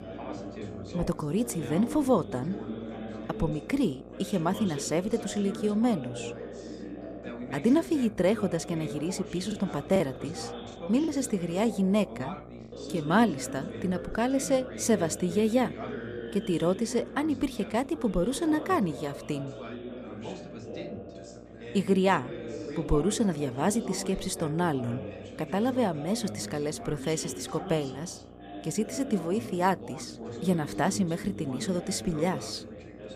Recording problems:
background chatter; noticeable; throughout; 3 voices, 10 dB below the speech
electrical hum; faint; throughout; 60 Hz, 20 dB below the speech
choppy; occasionally; from 9.5 to 11 s; 4% of the speech affected

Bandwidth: 14.5 kHz